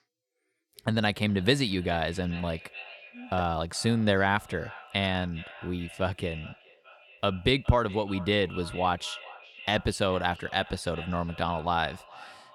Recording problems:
echo of what is said; noticeable; throughout; 420 ms later, 15 dB below the speech

